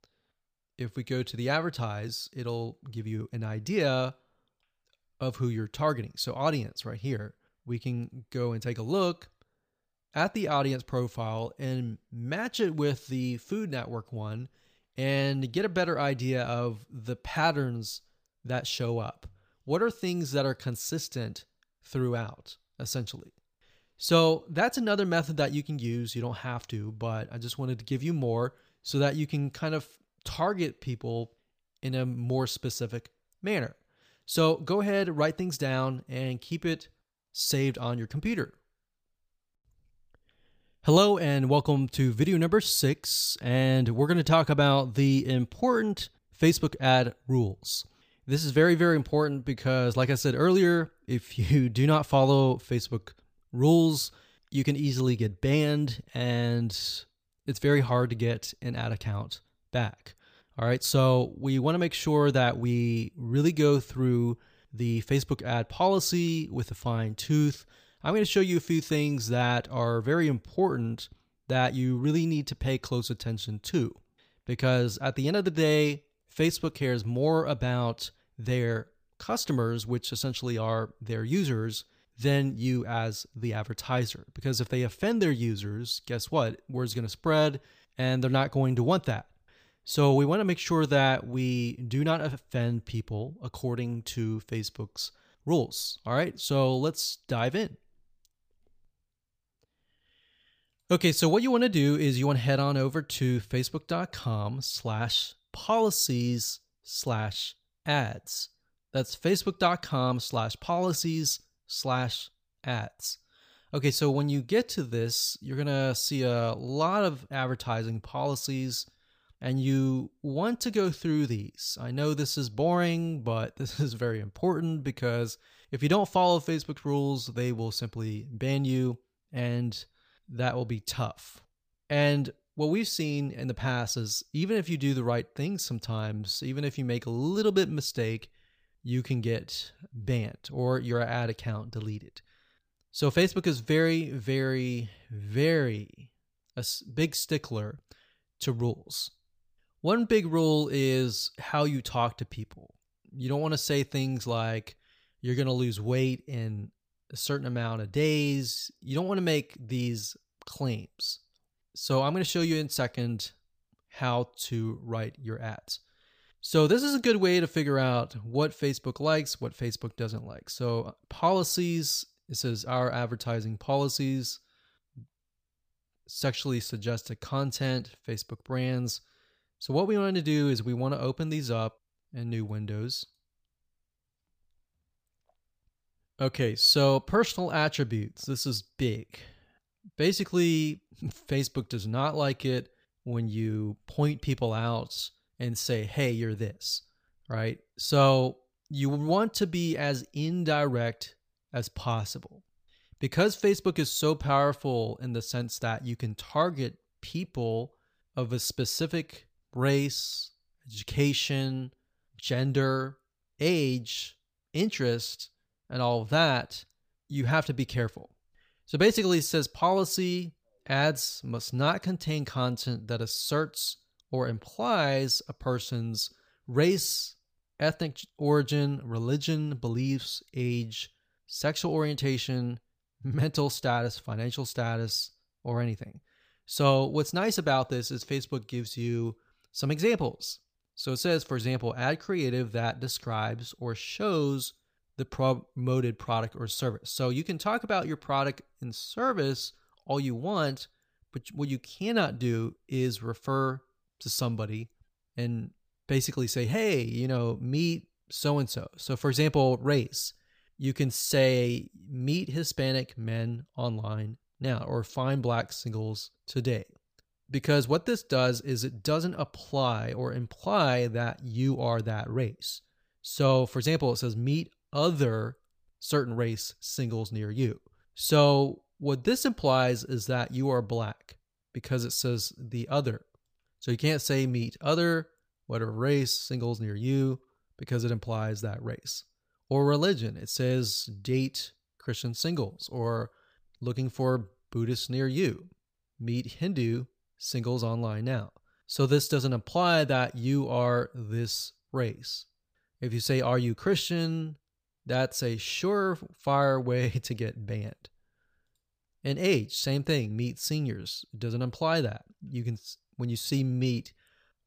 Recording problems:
none

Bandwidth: 15 kHz